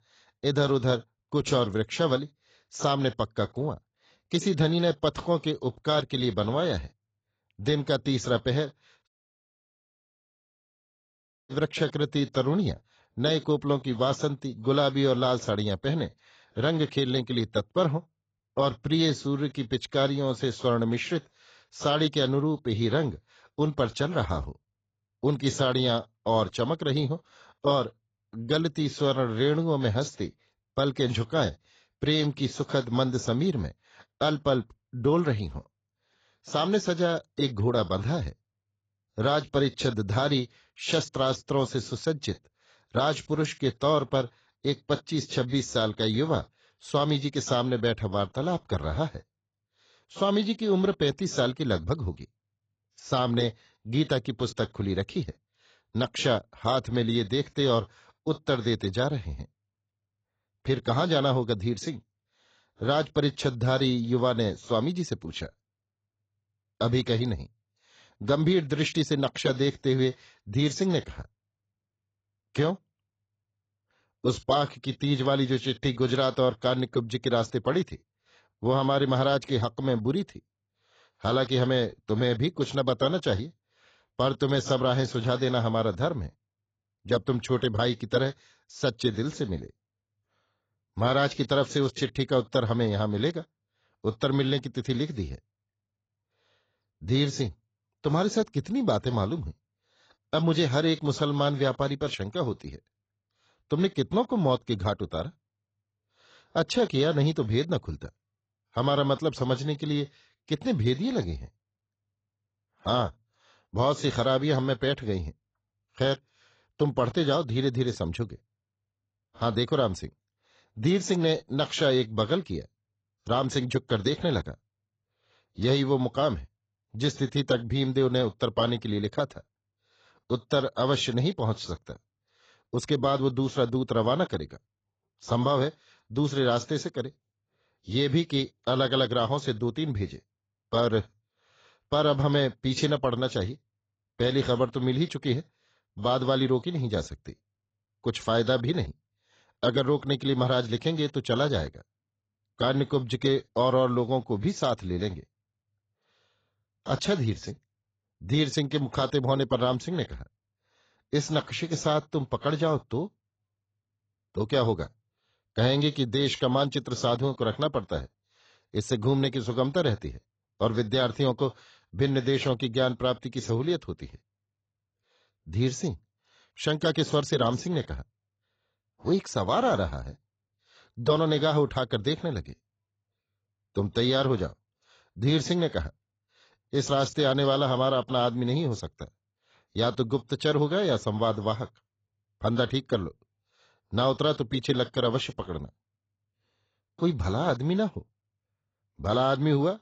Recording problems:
garbled, watery; badly; nothing above 7.5 kHz
audio cutting out; at 9 s for 2.5 s

